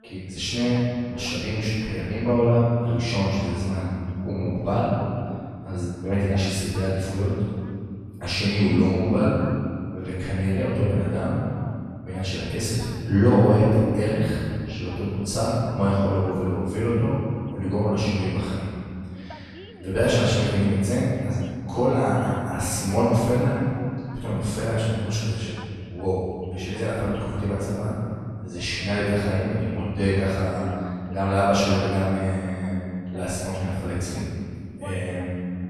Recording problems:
room echo; strong; dies away in 2.3 s
off-mic speech; far
voice in the background; faint; throughout; 25 dB below the speech

